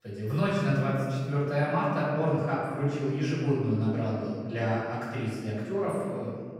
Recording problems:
room echo; strong; dies away in 2 s
off-mic speech; far

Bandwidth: 16 kHz